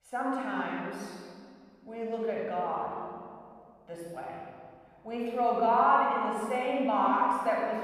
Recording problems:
room echo; strong; dies away in 1.9 s
off-mic speech; far

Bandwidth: 15.5 kHz